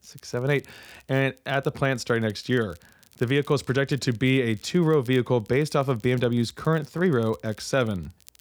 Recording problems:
crackle, like an old record; faint; 30 dB below the speech

